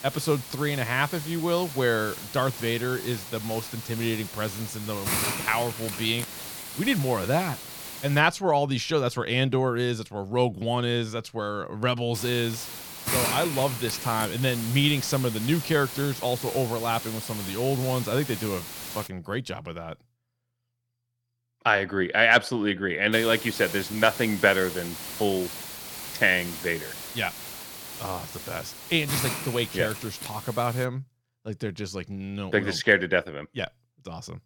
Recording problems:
hiss; loud; until 8 s, from 12 to 19 s and from 23 to 31 s; 8 dB below the speech

